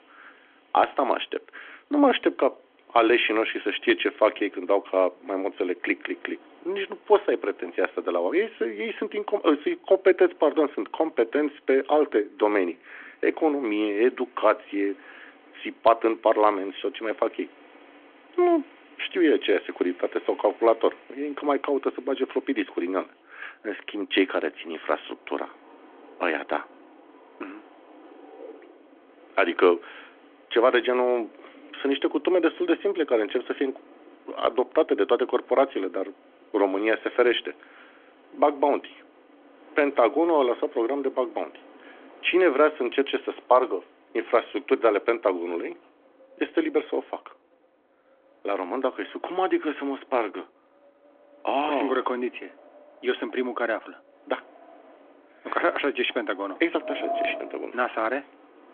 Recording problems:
phone-call audio; nothing above 3.5 kHz
wind in the background; faint; throughout; 20 dB below the speech

